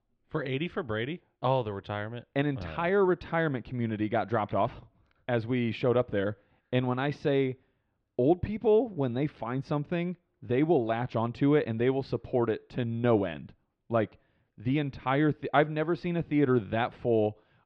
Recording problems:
muffled; slightly; fading above 3.5 kHz

